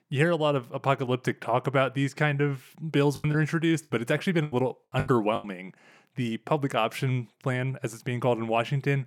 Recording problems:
choppy; very; from 3 to 5.5 s; 14% of the speech affected

